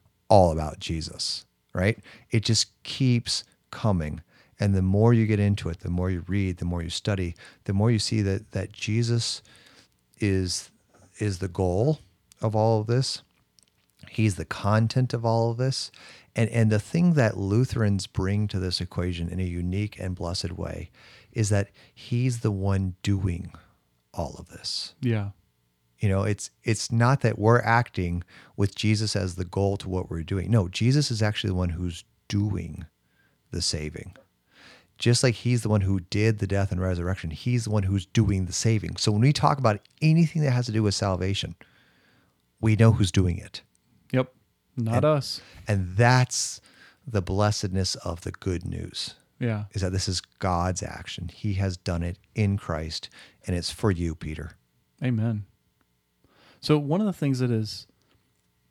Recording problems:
none

